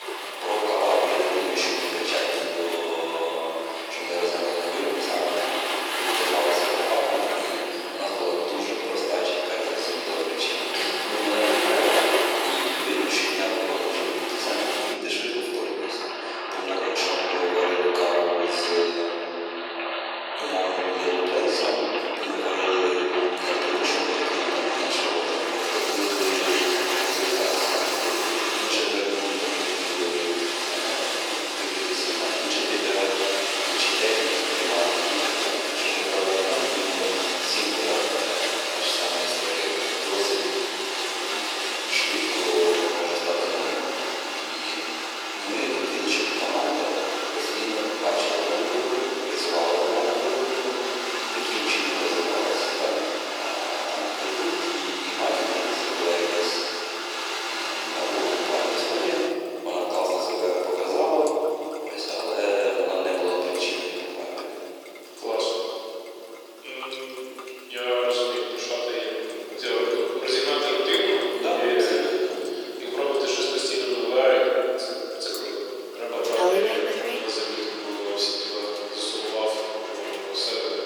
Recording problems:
room echo; strong; dies away in 3 s
off-mic speech; far
thin; very; fading below 350 Hz
rain or running water; loud; throughout; 1 dB below the speech

